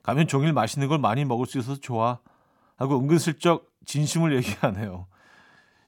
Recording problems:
none

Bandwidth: 17.5 kHz